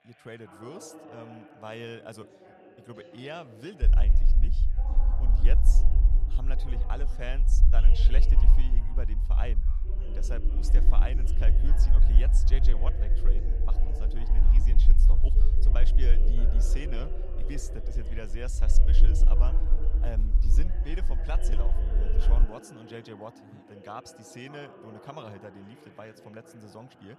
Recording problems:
background chatter; loud; throughout; 2 voices, 6 dB below the speech
low rumble; loud; from 4 to 22 s; 7 dB below the speech

